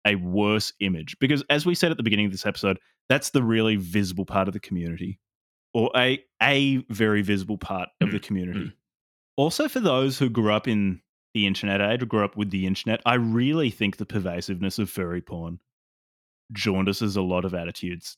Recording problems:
none

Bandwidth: 17 kHz